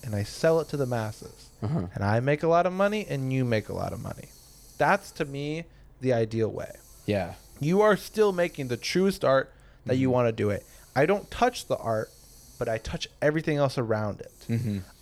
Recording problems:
hiss; faint; throughout; 25 dB below the speech

